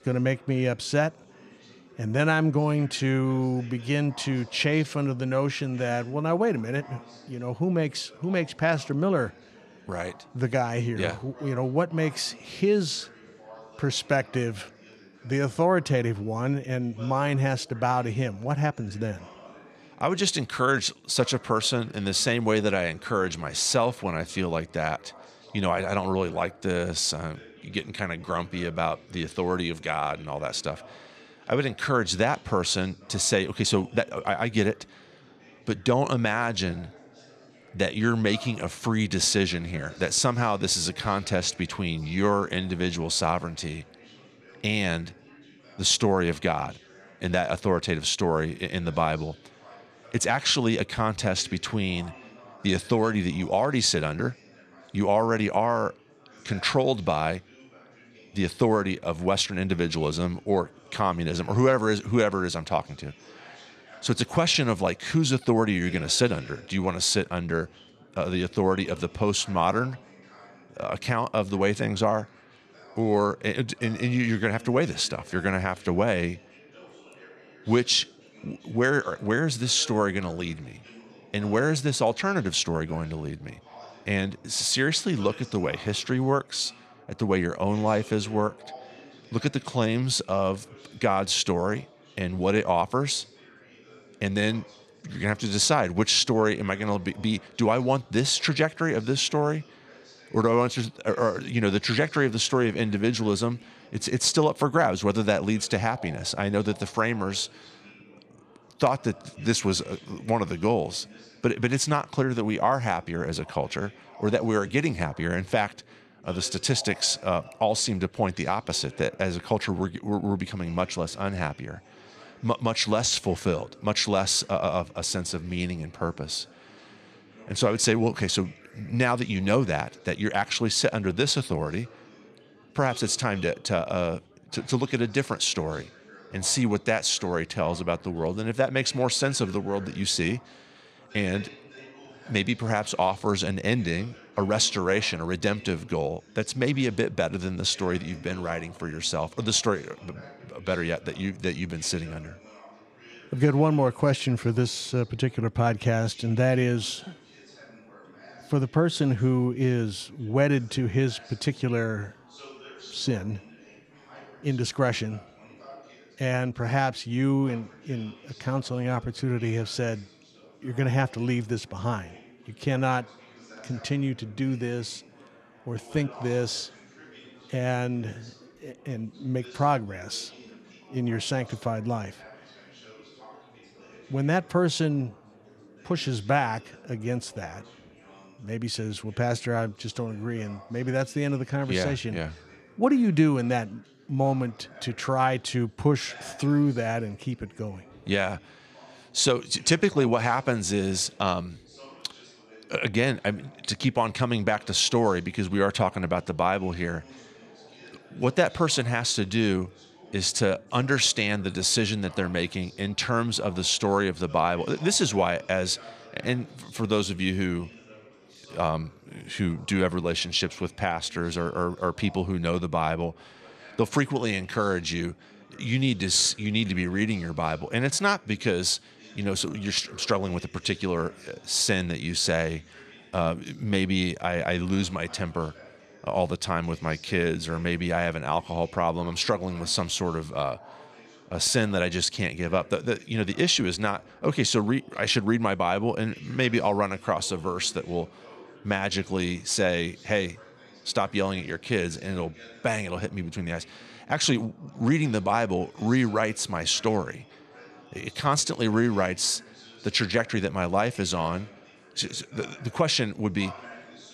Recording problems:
chatter from many people; faint; throughout; 25 dB below the speech

